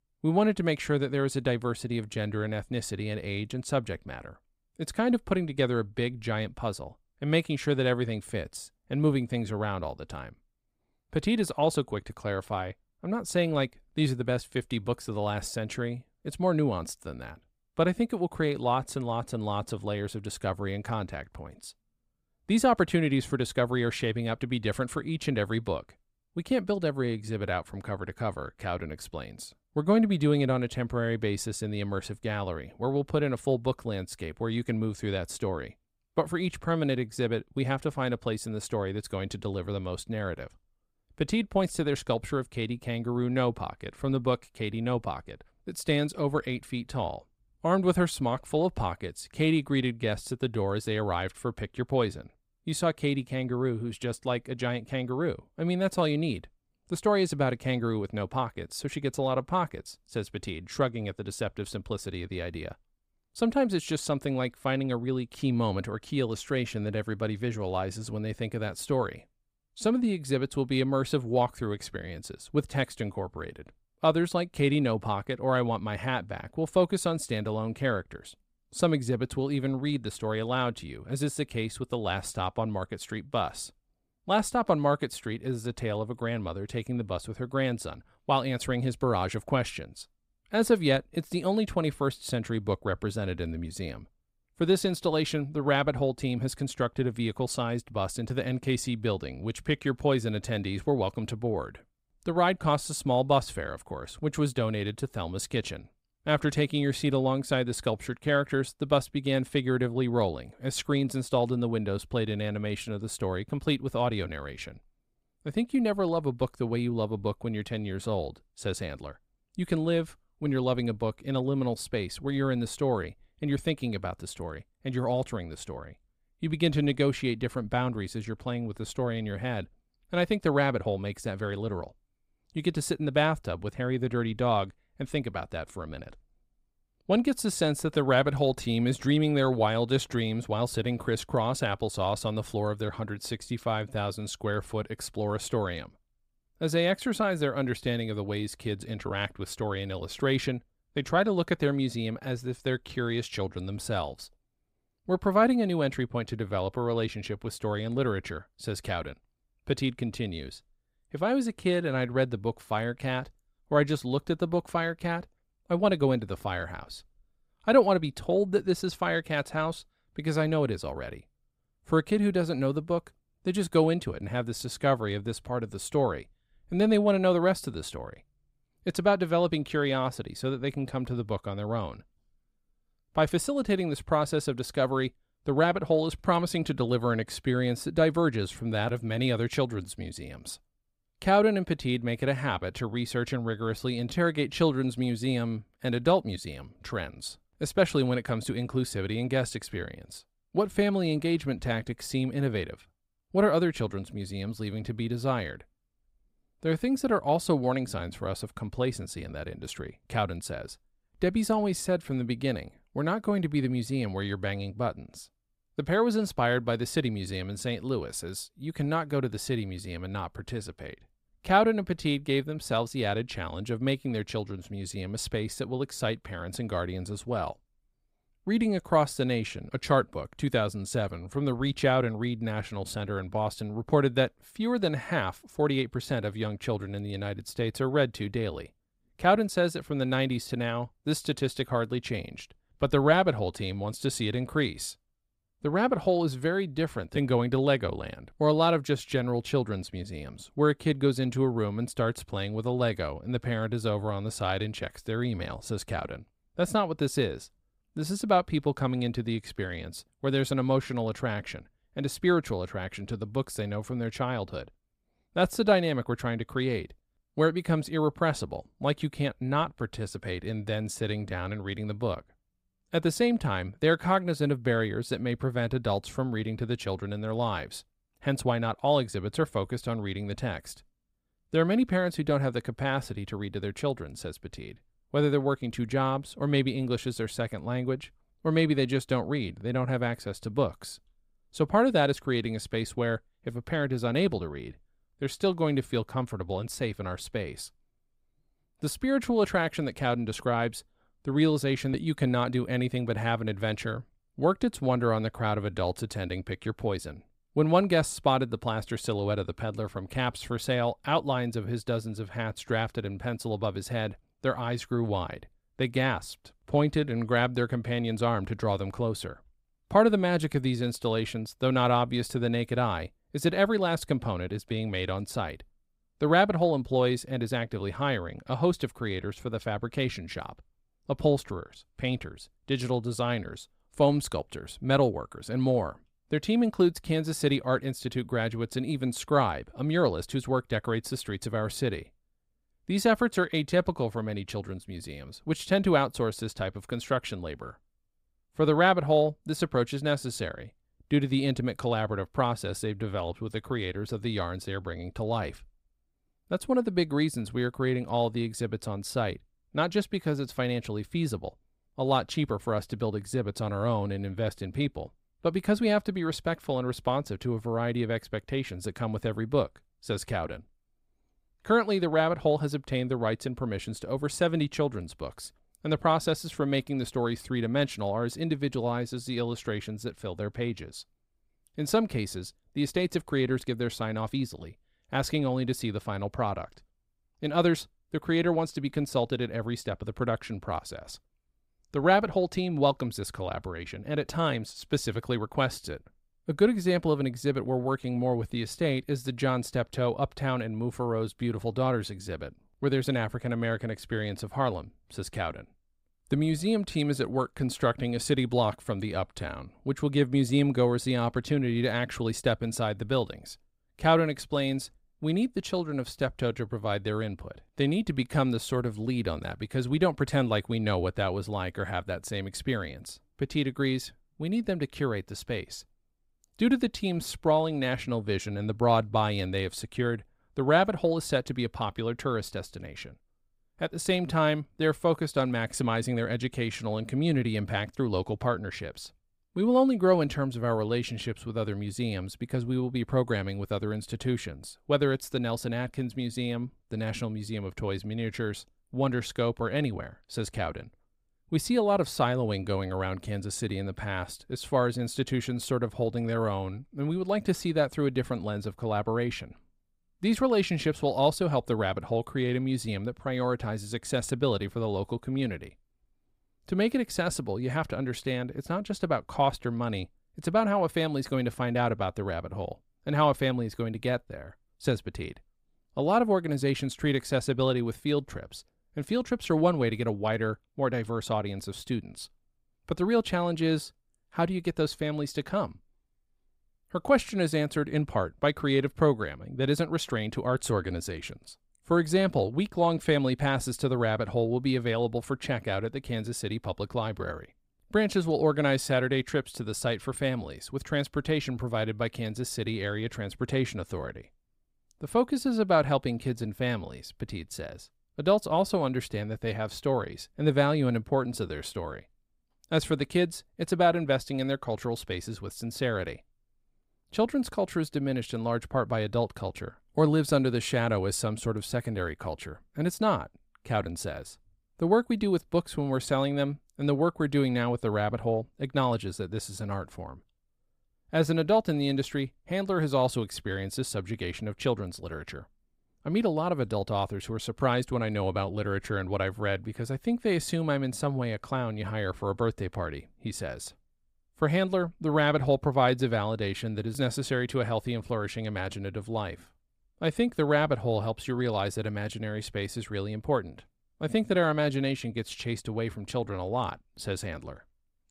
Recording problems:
none

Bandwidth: 15.5 kHz